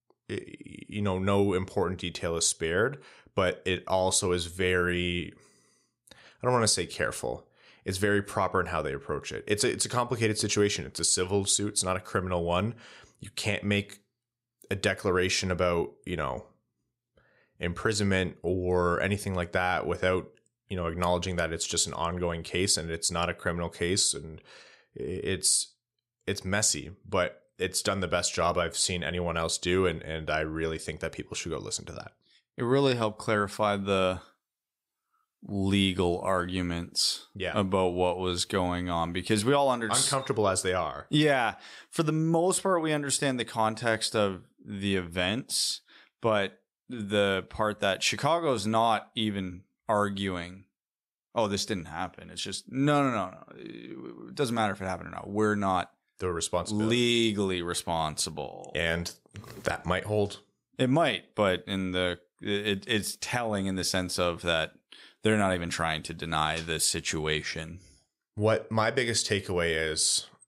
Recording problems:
none

